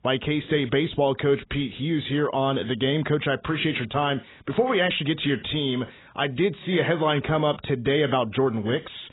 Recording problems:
garbled, watery; badly; nothing above 3.5 kHz

